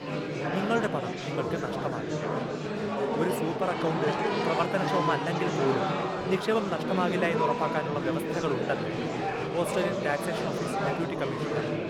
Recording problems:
murmuring crowd; very loud; throughout; 1 dB above the speech
background music; noticeable; throughout; 20 dB below the speech
crowd noise; faint; throughout; 25 dB below the speech

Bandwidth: 17.5 kHz